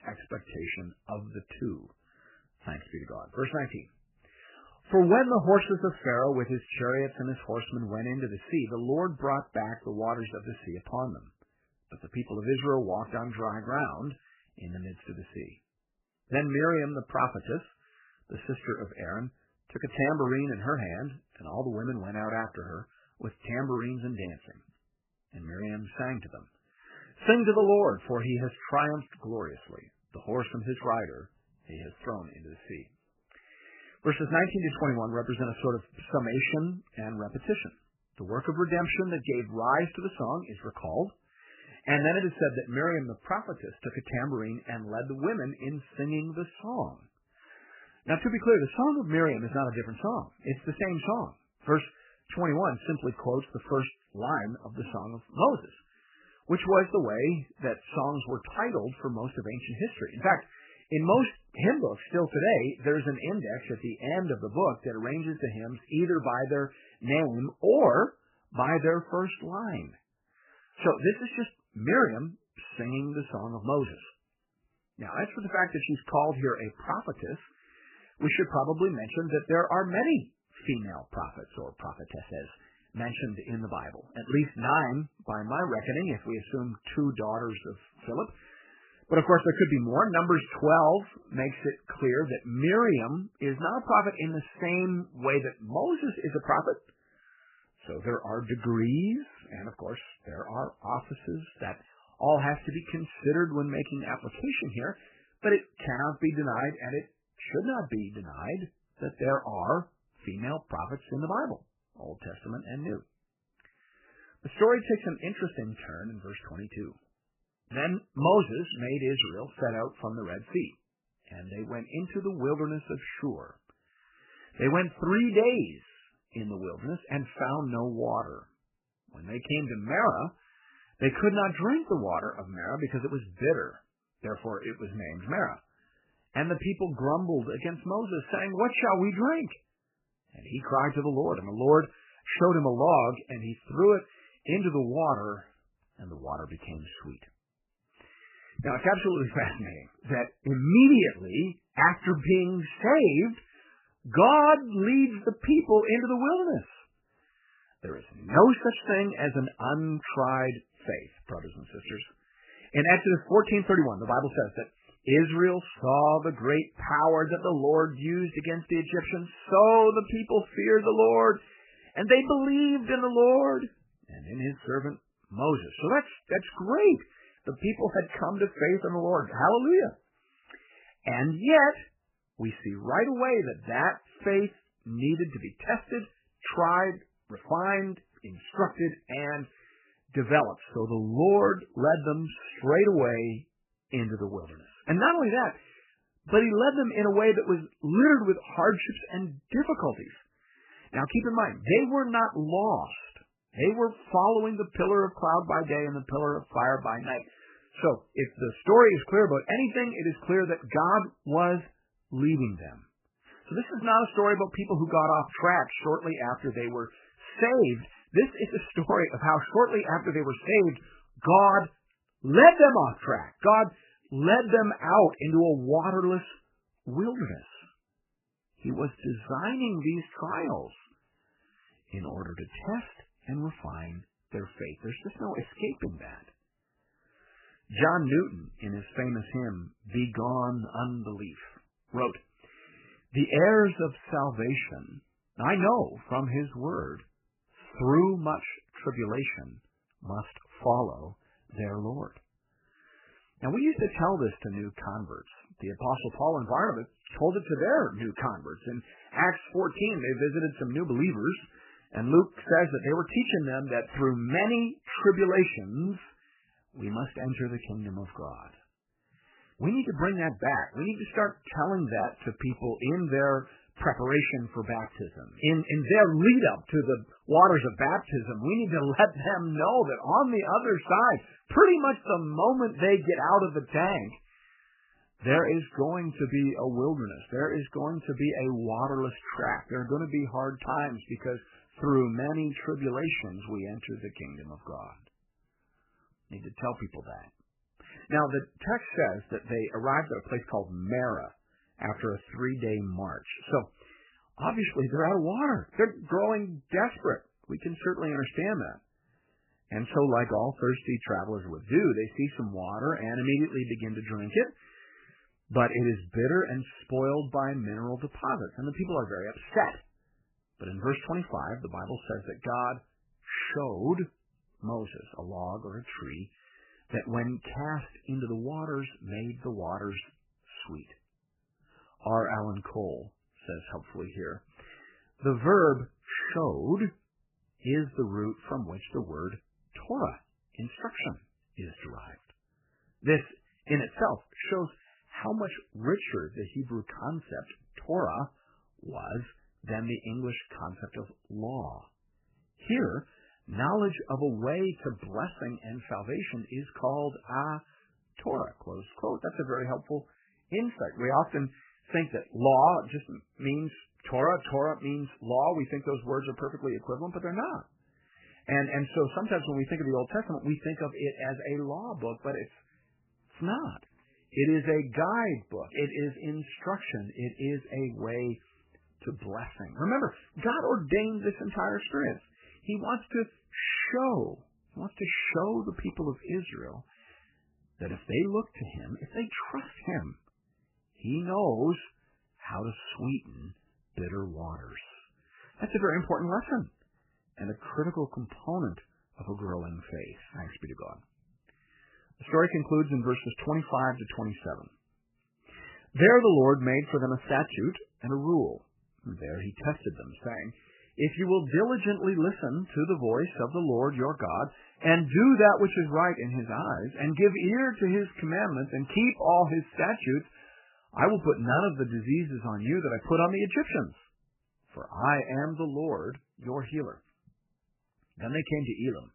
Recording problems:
garbled, watery; badly; nothing above 3 kHz

